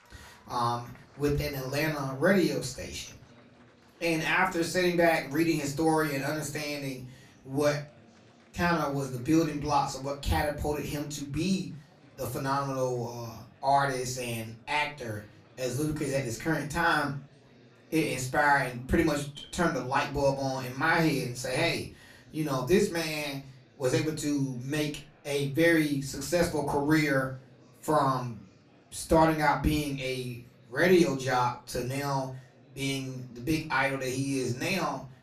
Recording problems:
off-mic speech; far
room echo; very slight; dies away in 0.3 s
murmuring crowd; faint; throughout; 30 dB below the speech

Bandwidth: 14.5 kHz